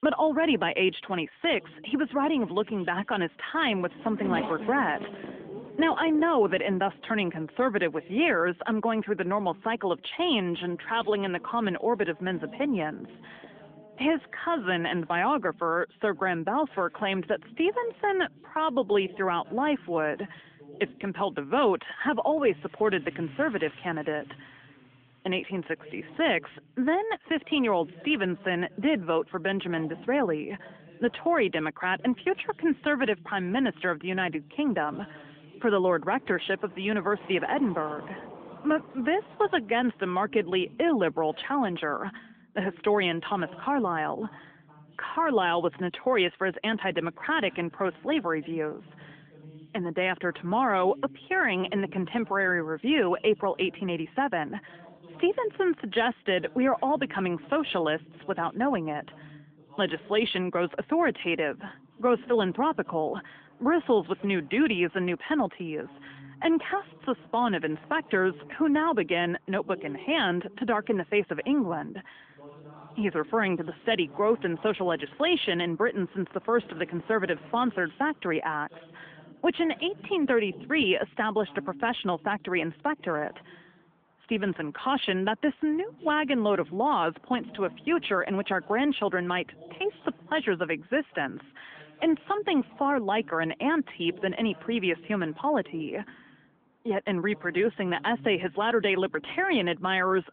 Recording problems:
phone-call audio; nothing above 3.5 kHz
traffic noise; noticeable; throughout; 20 dB below the speech
voice in the background; faint; throughout; 25 dB below the speech

